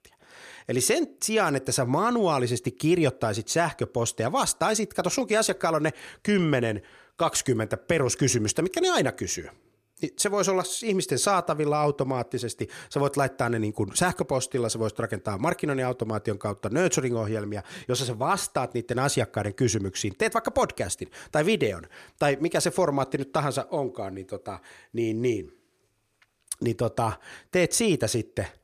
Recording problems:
none

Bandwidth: 14.5 kHz